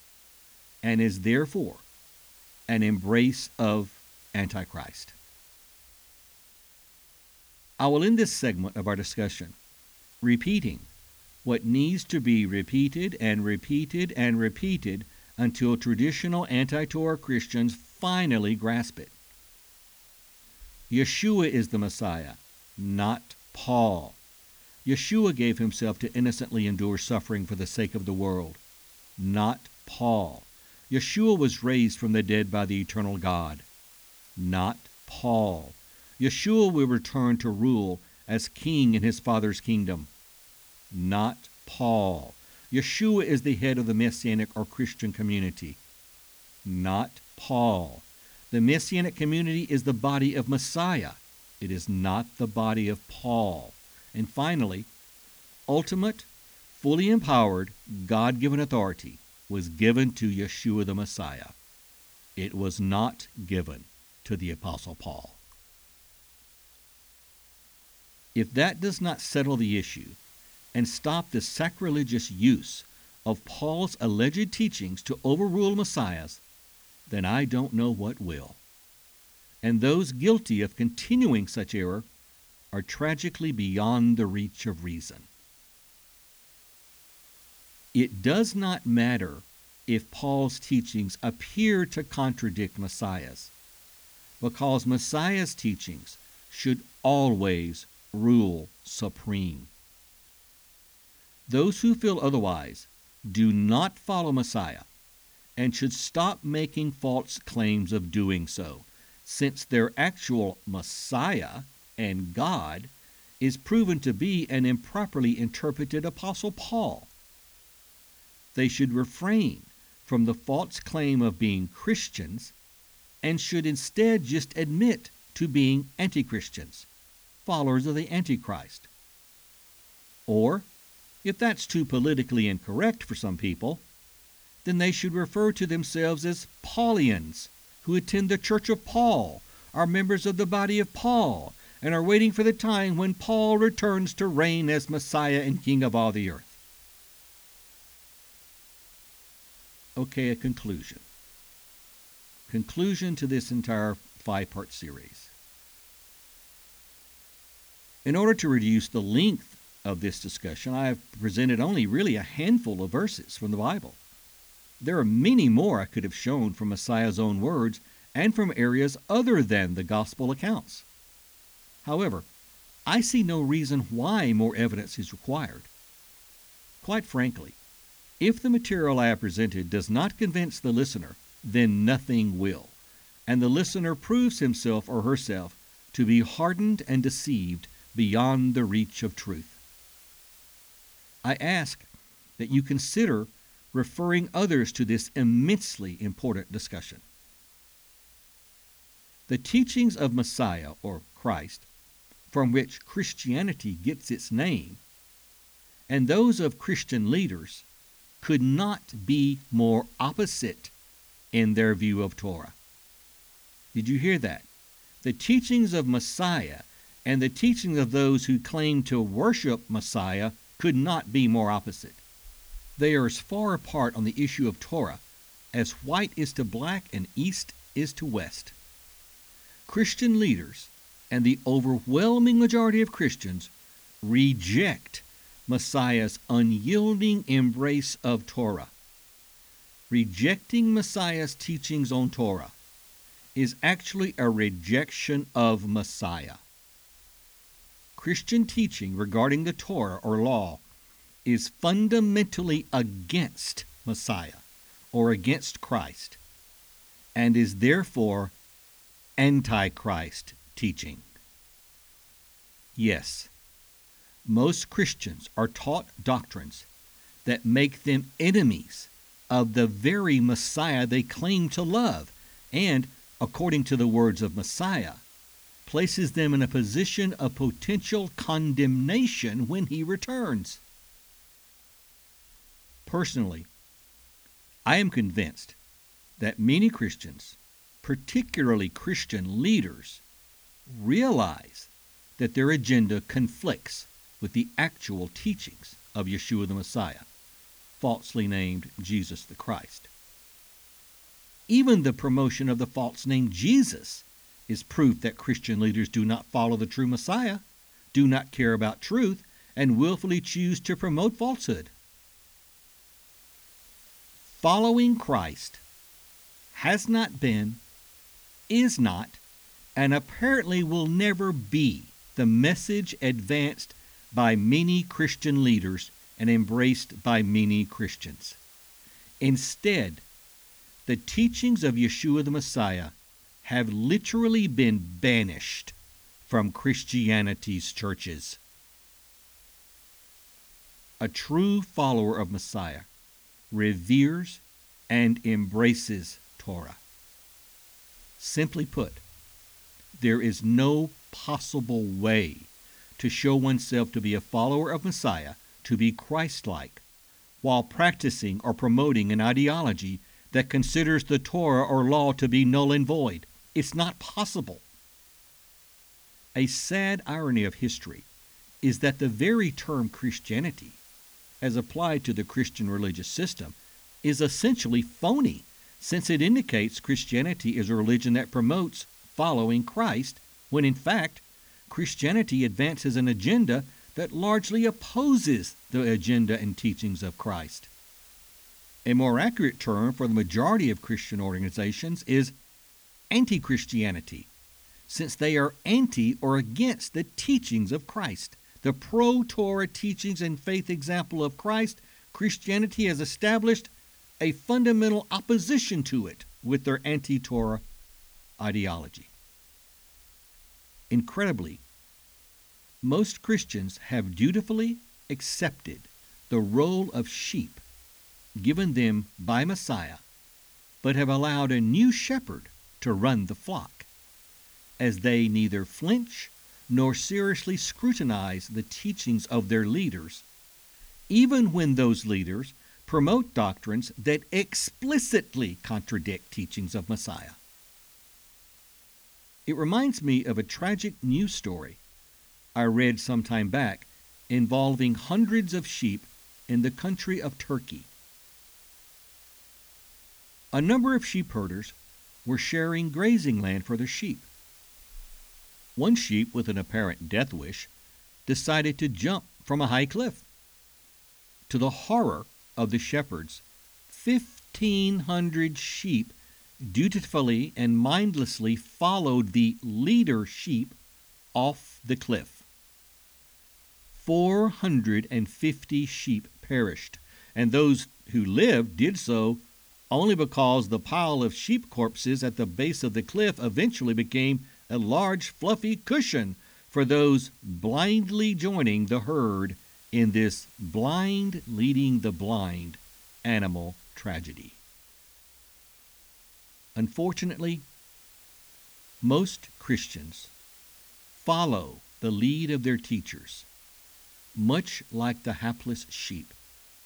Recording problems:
hiss; faint; throughout; 25 dB below the speech

